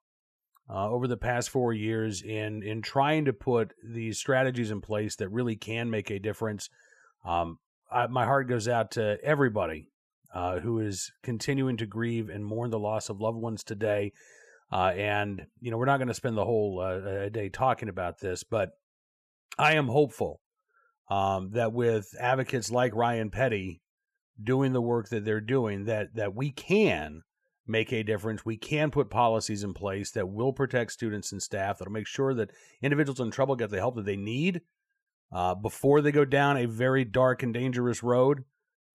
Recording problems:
none

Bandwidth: 14.5 kHz